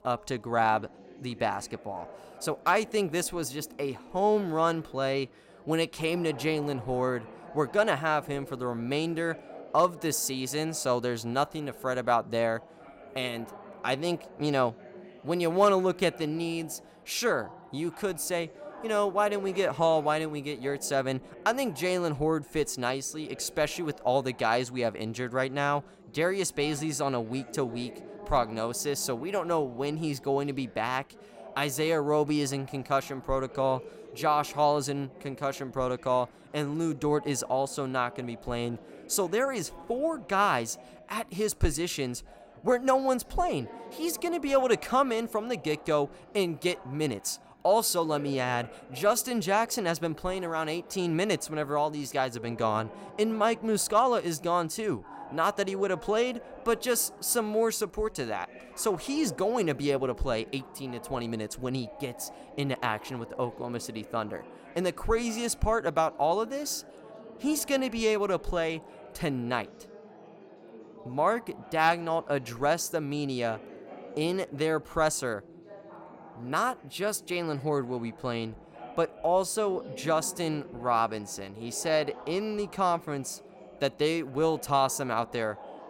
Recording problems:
chatter from many people; noticeable; throughout; 20 dB below the speech

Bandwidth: 16 kHz